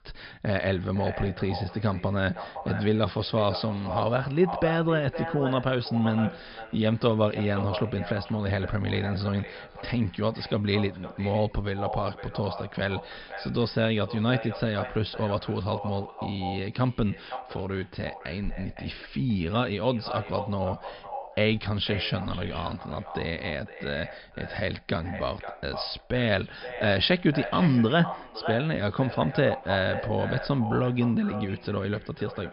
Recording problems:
echo of what is said; strong; throughout; 510 ms later, 10 dB below the speech
high frequencies cut off; noticeable; nothing above 5.5 kHz

